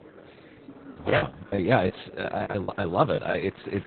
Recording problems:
garbled, watery; badly; nothing above 4 kHz
murmuring crowd; faint; throughout; 20 dB below the speech
choppy; very; 11% of the speech affected

